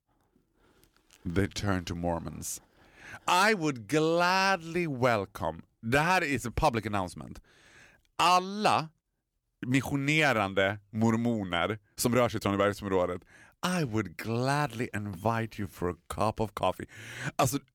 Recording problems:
uneven, jittery; strongly; from 1 to 17 s

